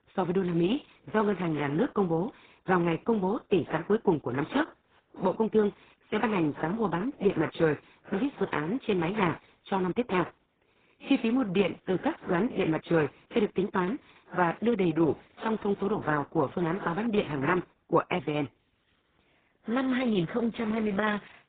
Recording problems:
garbled, watery; badly; nothing above 3.5 kHz

